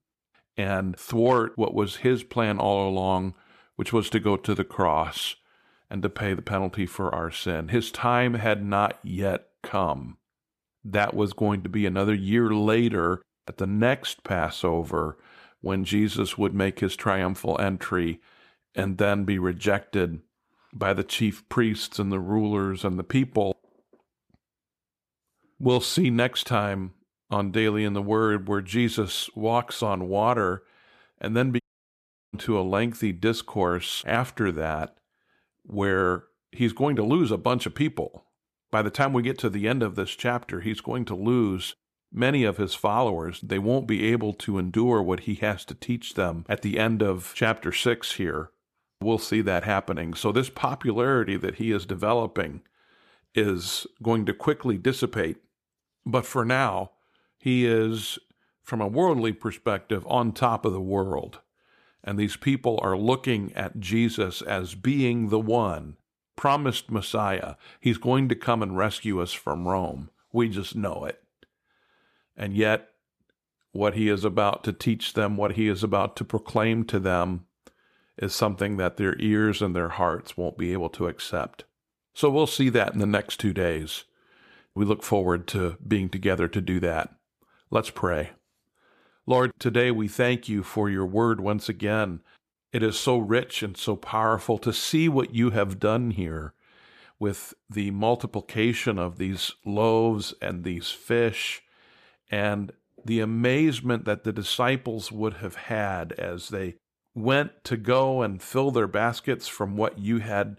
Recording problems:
audio cutting out; at 32 s for 0.5 s

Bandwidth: 14.5 kHz